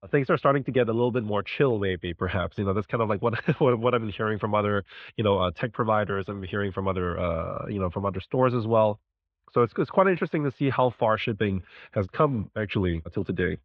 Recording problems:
muffled; very; fading above 3.5 kHz

